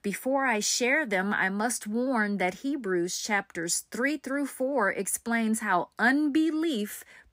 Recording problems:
none

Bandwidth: 15.5 kHz